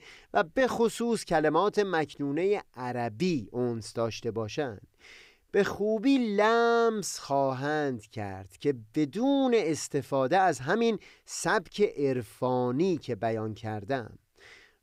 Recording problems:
none

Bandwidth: 15.5 kHz